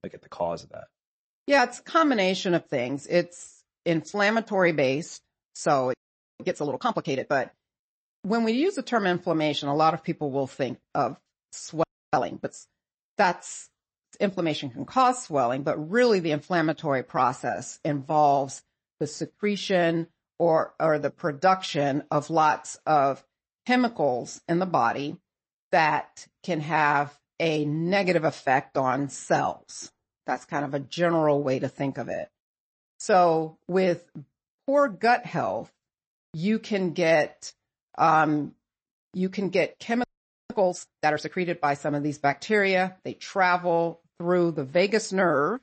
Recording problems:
garbled, watery; slightly; nothing above 8 kHz
audio freezing; at 6 s, at 12 s and at 40 s

